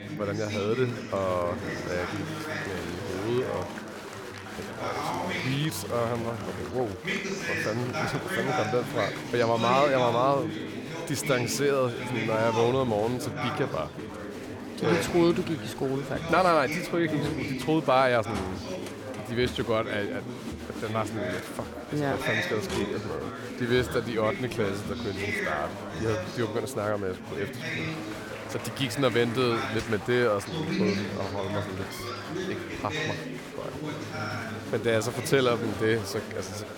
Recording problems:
chatter from many people; loud; throughout; 5 dB below the speech

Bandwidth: 18 kHz